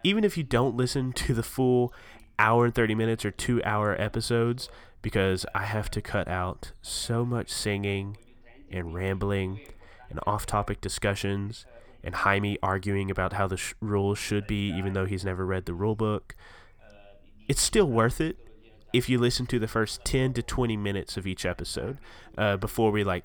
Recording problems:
voice in the background; faint; throughout; 30 dB below the speech

